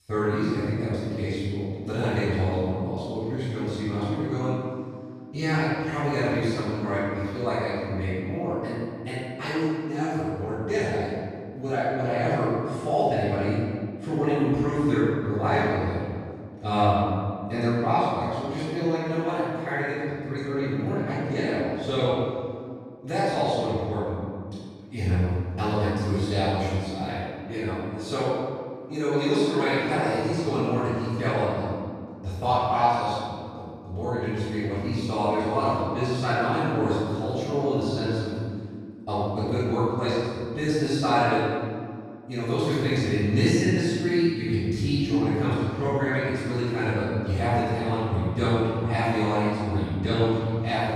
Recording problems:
room echo; strong; dies away in 2 s
off-mic speech; far

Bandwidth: 14.5 kHz